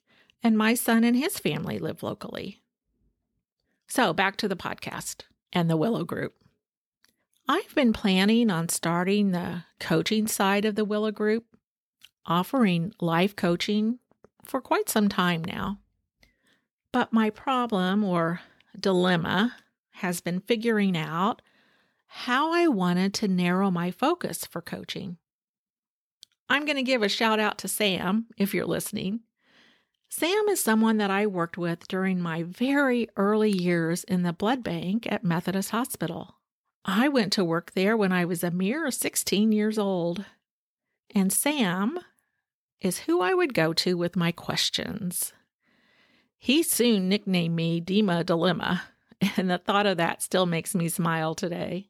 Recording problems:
none

